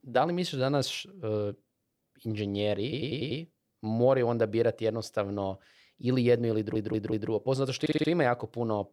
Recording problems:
audio stuttering; at 3 s, at 6.5 s and at 8 s

